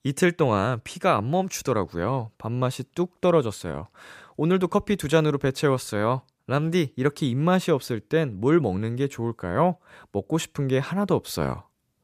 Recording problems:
none

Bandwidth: 14.5 kHz